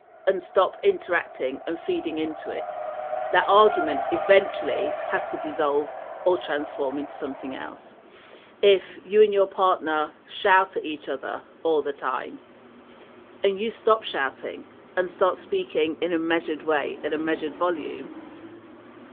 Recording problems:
phone-call audio; nothing above 3.5 kHz
traffic noise; loud; throughout; 10 dB below the speech

